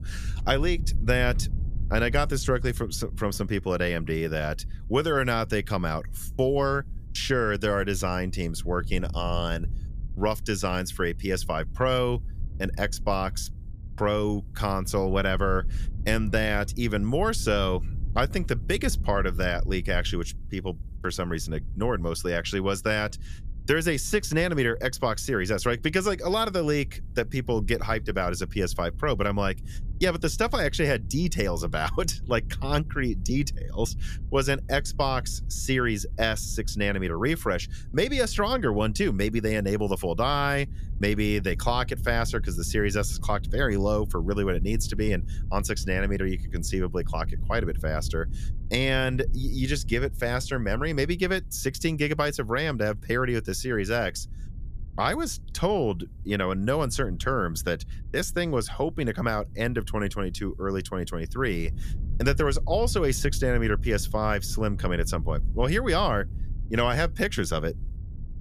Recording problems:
low rumble; faint; throughout; 25 dB below the speech

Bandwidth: 14.5 kHz